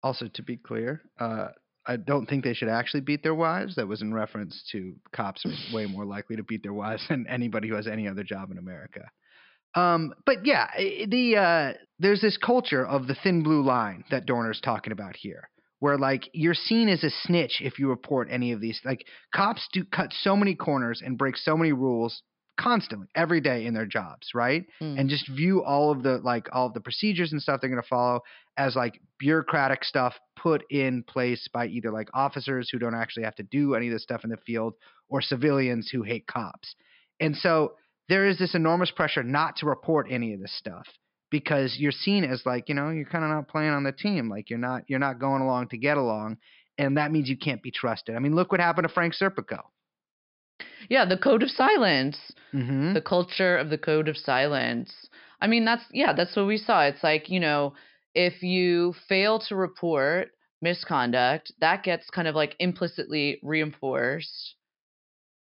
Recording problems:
high frequencies cut off; noticeable; nothing above 5.5 kHz

